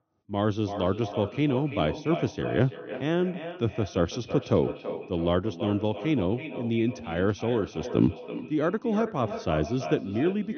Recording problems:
echo of what is said; strong; throughout; 330 ms later, 10 dB below the speech
high frequencies cut off; noticeable; nothing above 6 kHz

